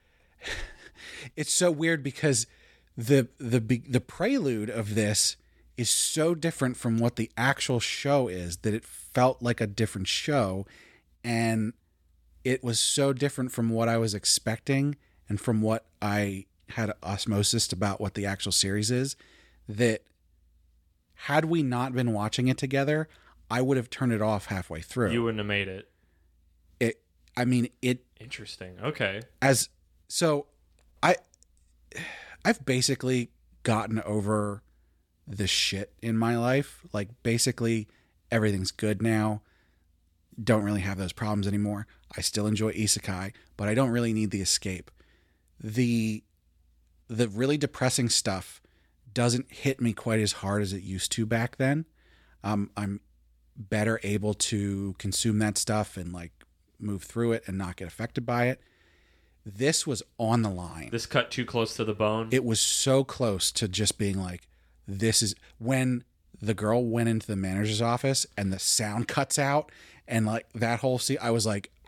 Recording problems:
none

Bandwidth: 18 kHz